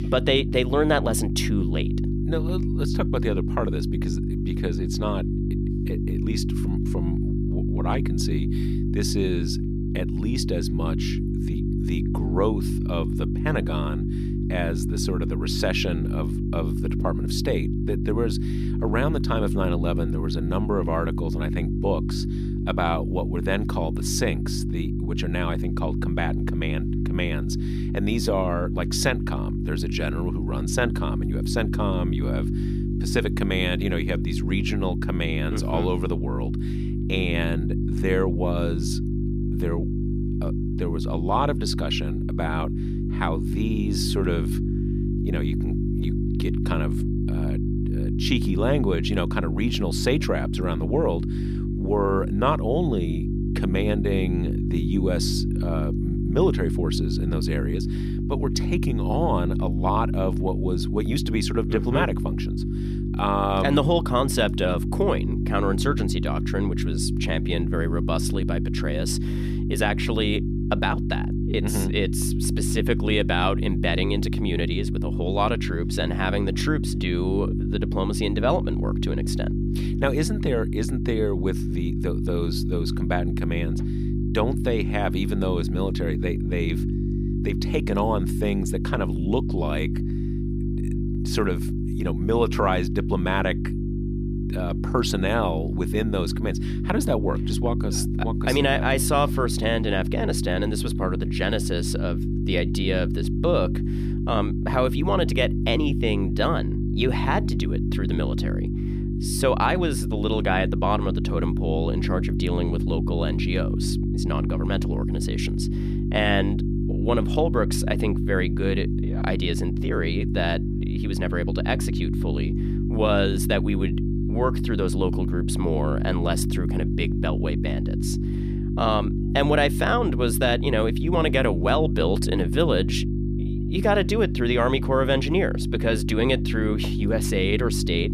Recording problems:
electrical hum; loud; throughout; 50 Hz, 7 dB below the speech

